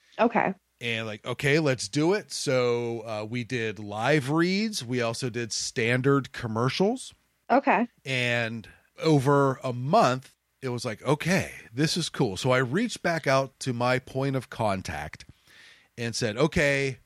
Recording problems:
none

